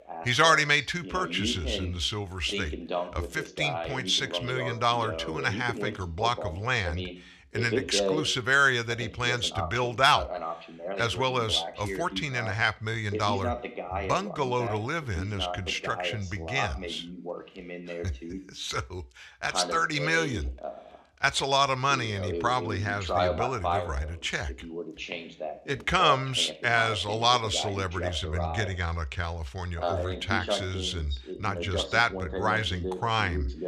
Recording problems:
voice in the background; loud; throughout; 8 dB below the speech

